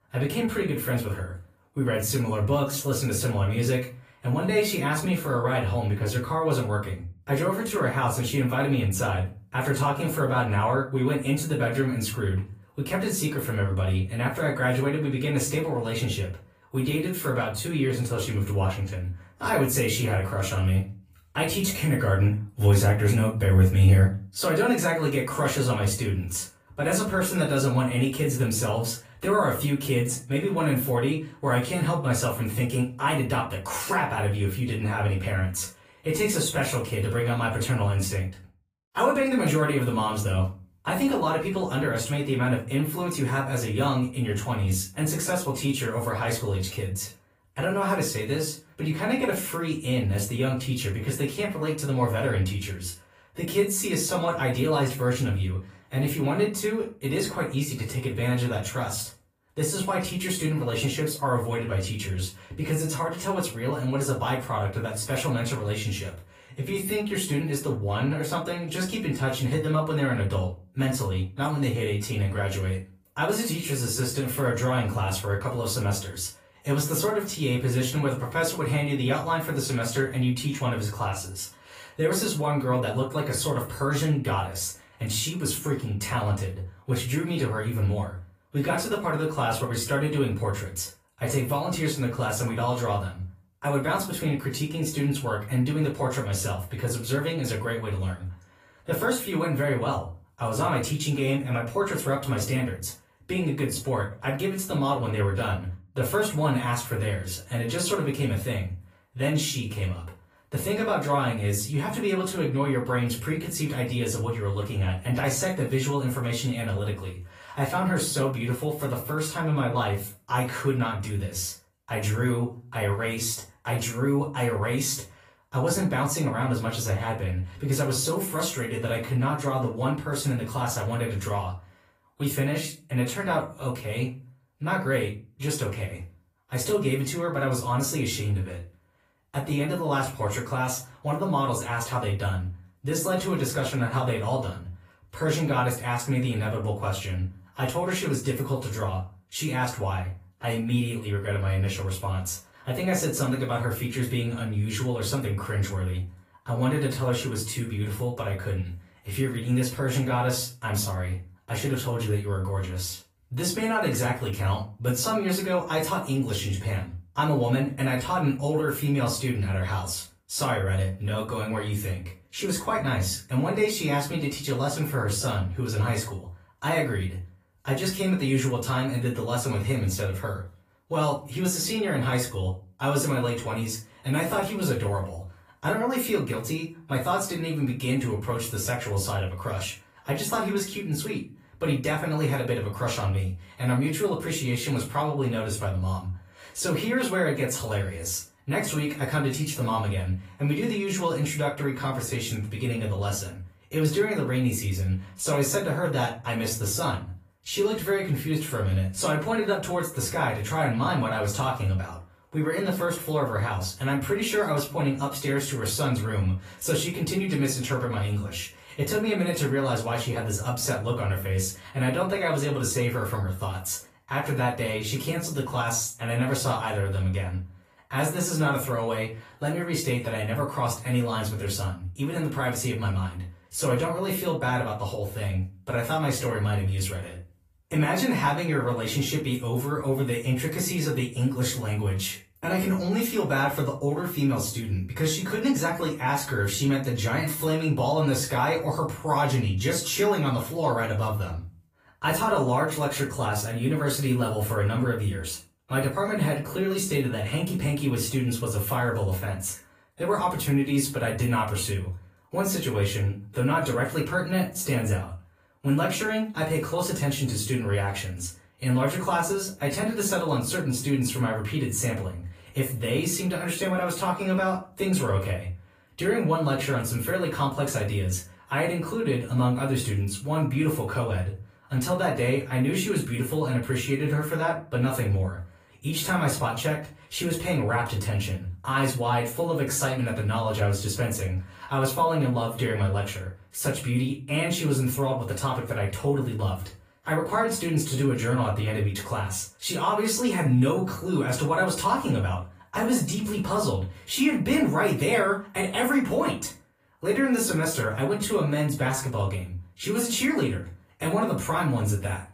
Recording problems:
off-mic speech; far
room echo; slight; dies away in 0.3 s
garbled, watery; slightly; nothing above 15 kHz

